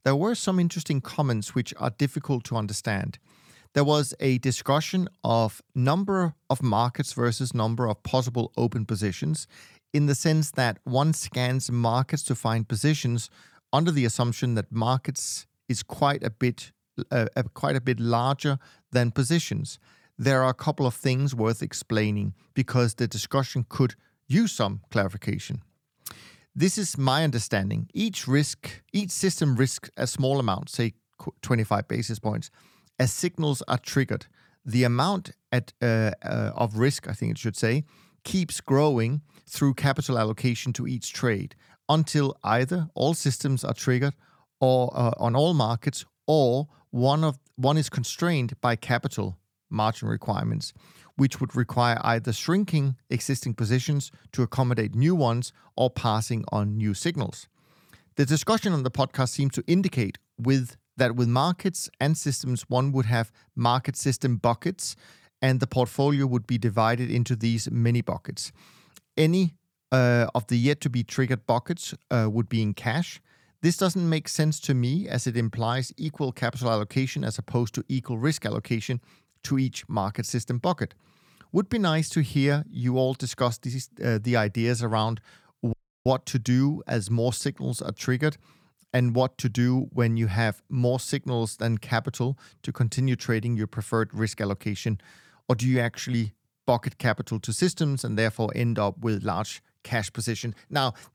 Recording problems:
audio cutting out; at 1:26

